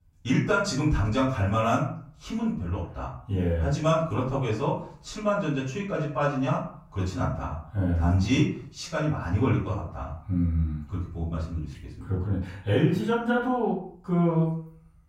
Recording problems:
off-mic speech; far
room echo; noticeable; dies away in 0.4 s

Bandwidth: 16 kHz